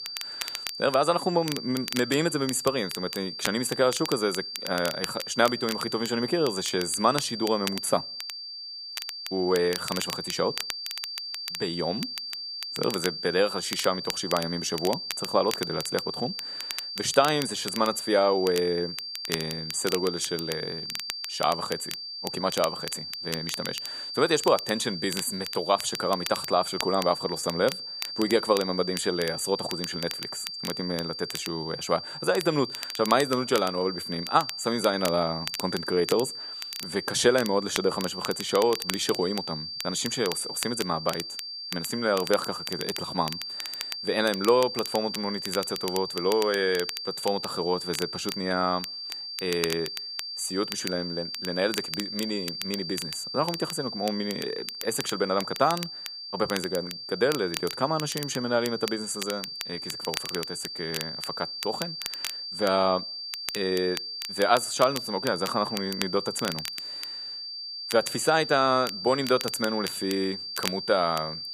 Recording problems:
high-pitched whine; loud; throughout; 4.5 kHz, 6 dB below the speech
crackle, like an old record; noticeable; 10 dB below the speech

